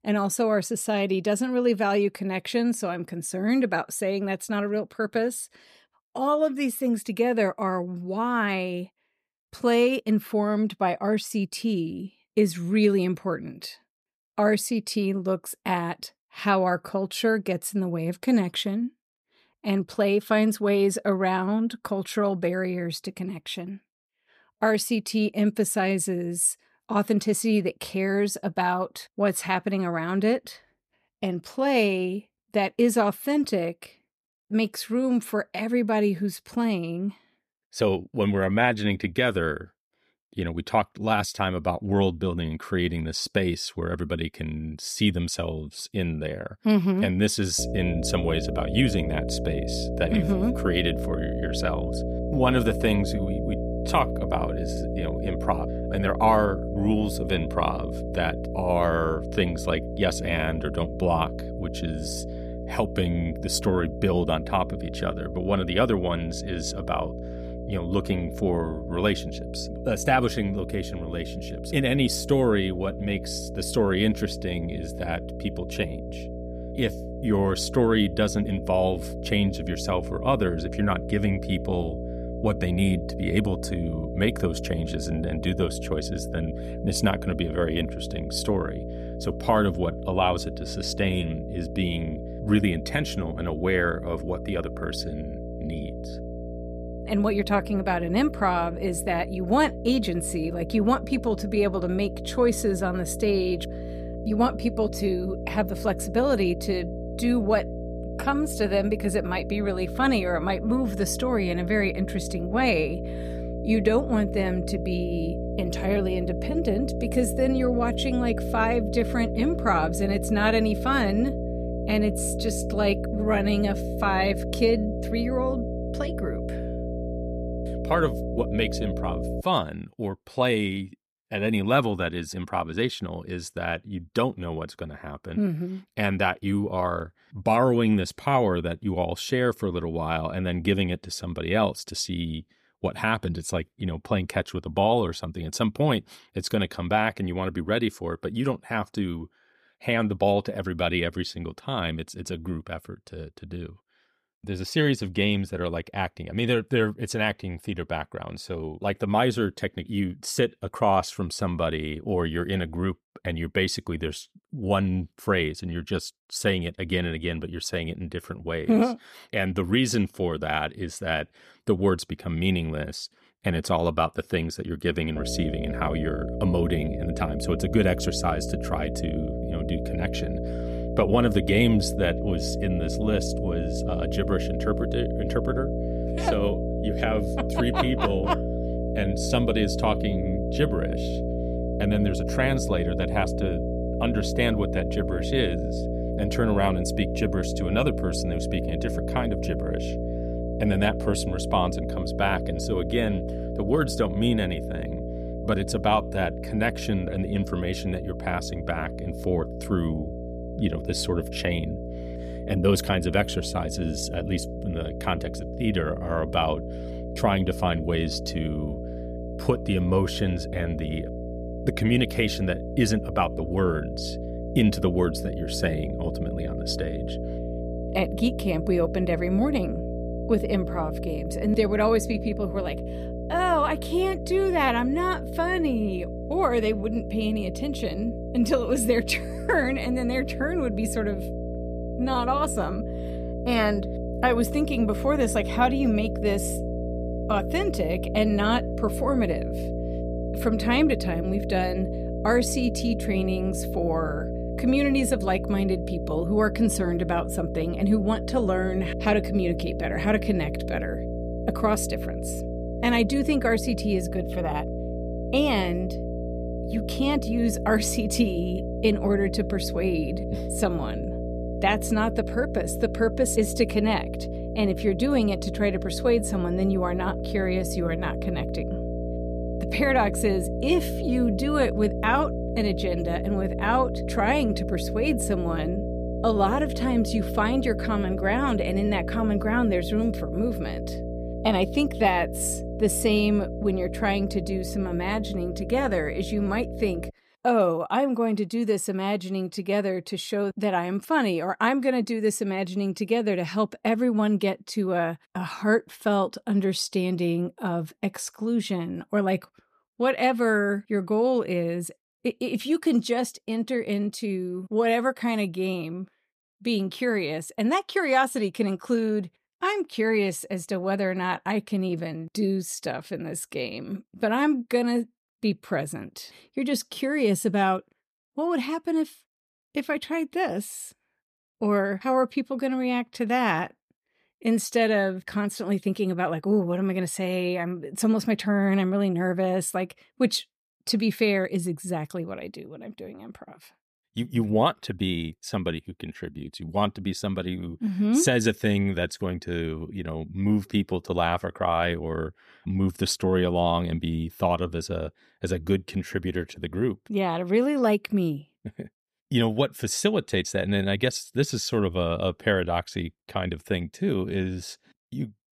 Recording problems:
electrical hum; loud; from 48 s to 2:09 and from 2:55 to 4:57; 60 Hz, 8 dB below the speech

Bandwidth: 14.5 kHz